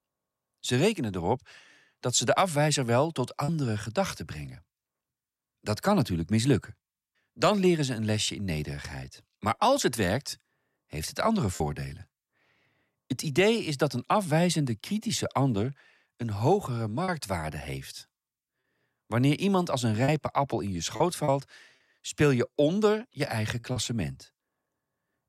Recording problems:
choppy; occasionally; 2% of the speech affected

